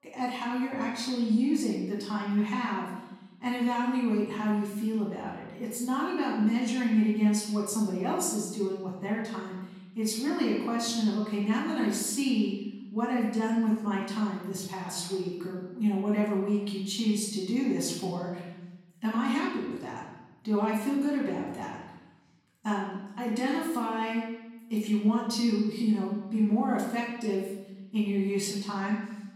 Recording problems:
off-mic speech; far
room echo; noticeable; dies away in 1 s

